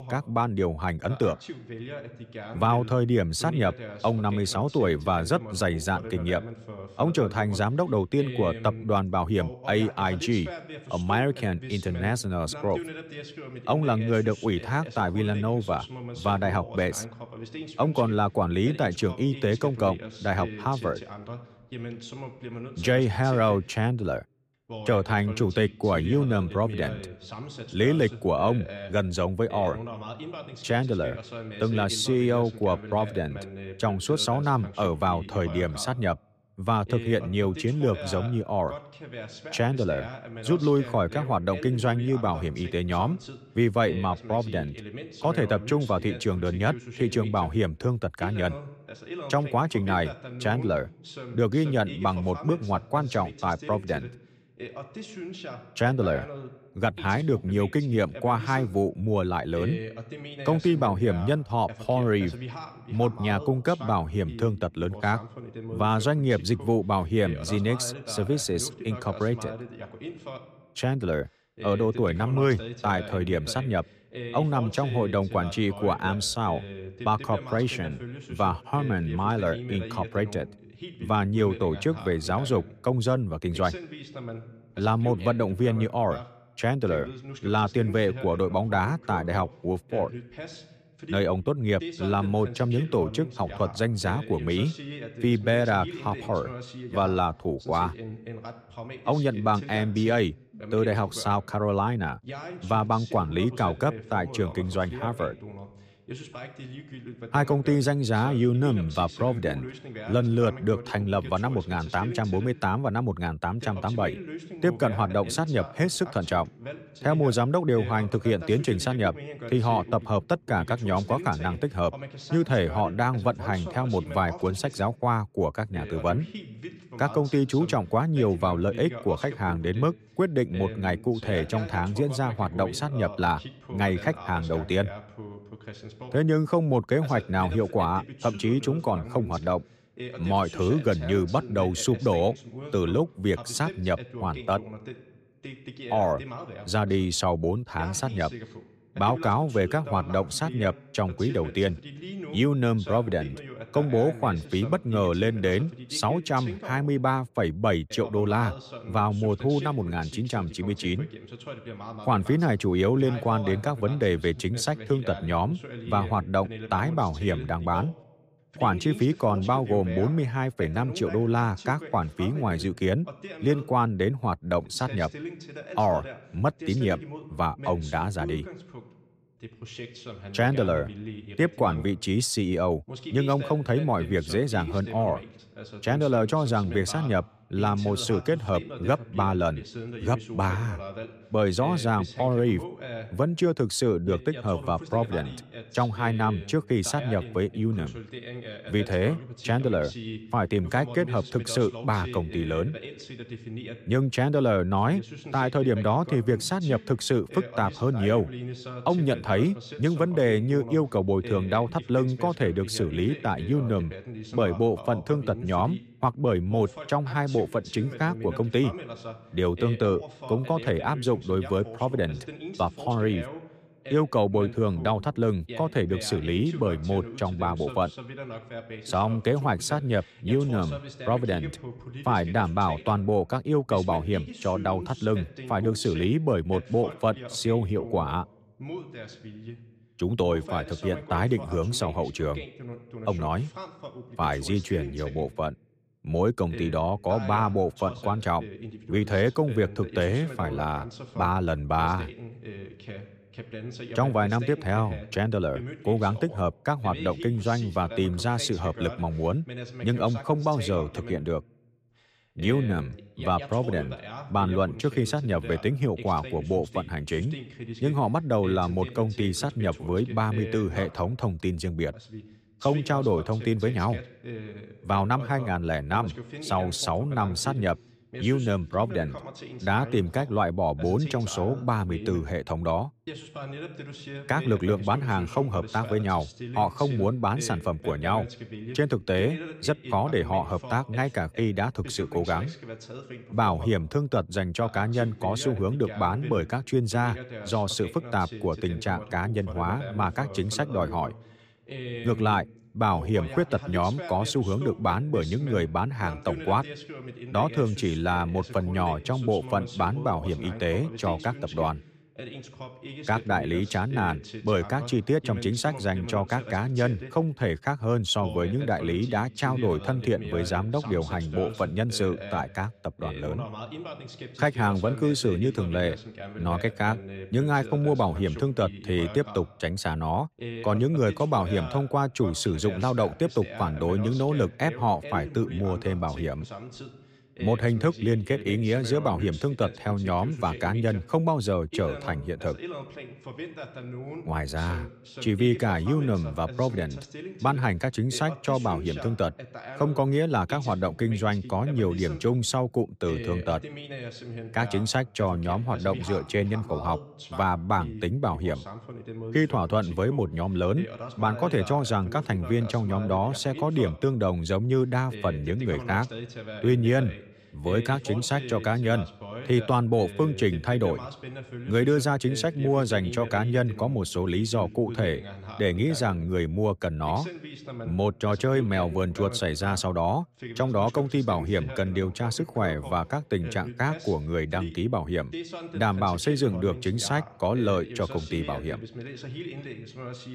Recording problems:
voice in the background; noticeable; throughout; 15 dB below the speech

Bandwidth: 15 kHz